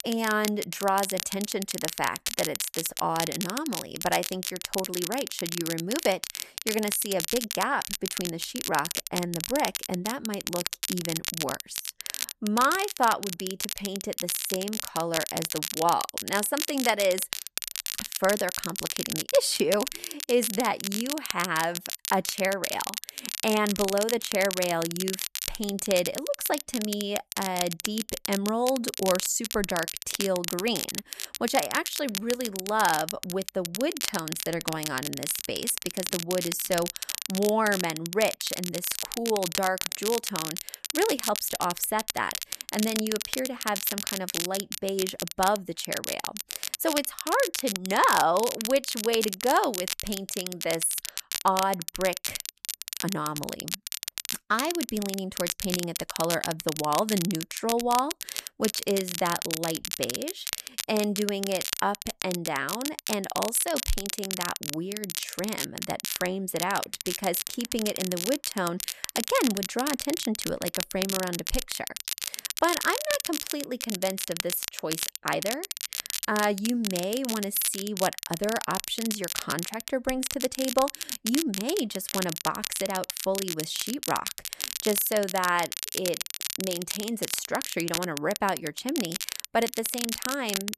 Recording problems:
crackle, like an old record; loud; 3 dB below the speech

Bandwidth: 14 kHz